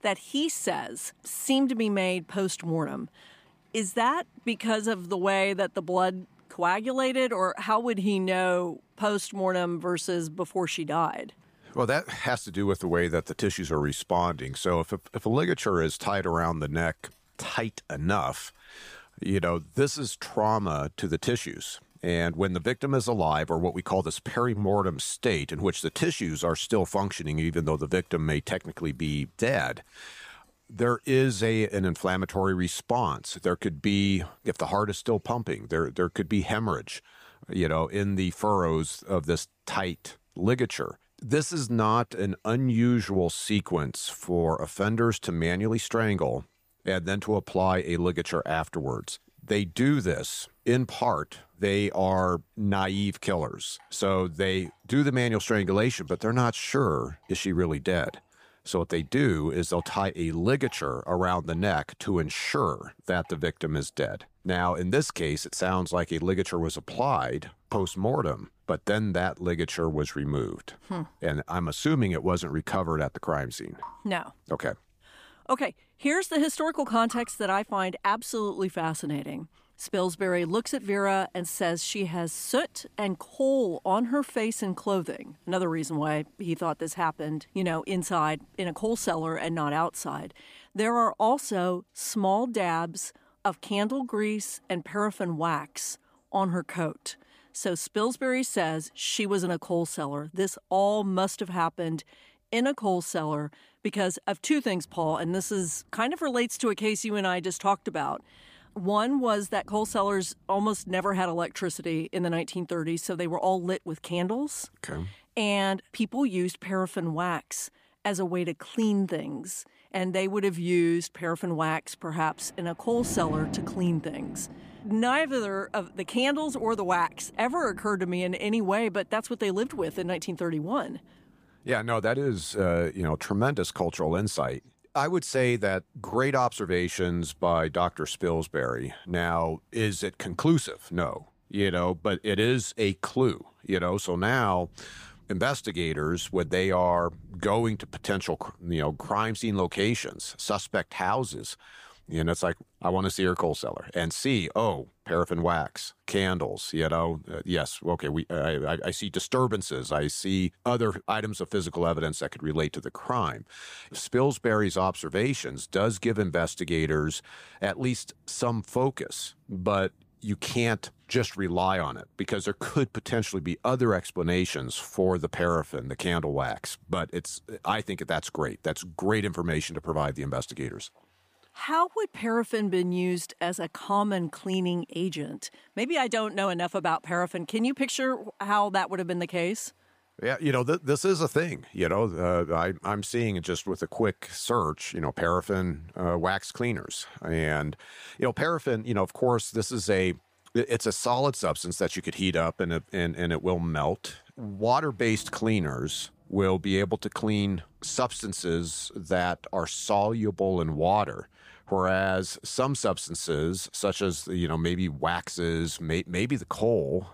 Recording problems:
rain or running water; faint; throughout; 25 dB below the speech

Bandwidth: 15 kHz